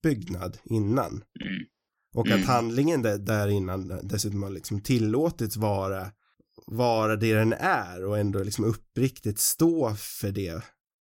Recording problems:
none

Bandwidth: 16.5 kHz